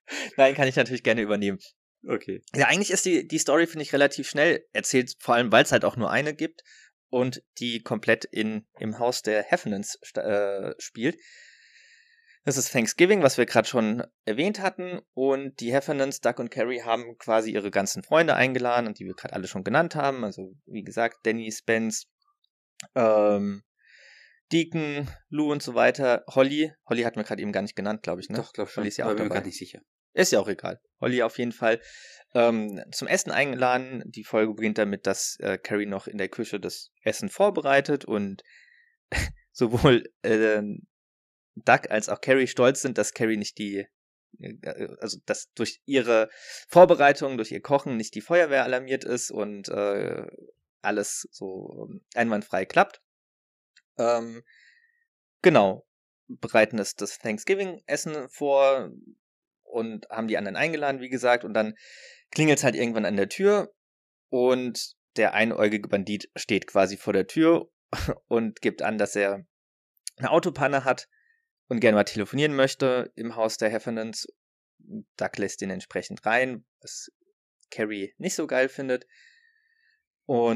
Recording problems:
abrupt cut into speech; at the end

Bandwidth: 14.5 kHz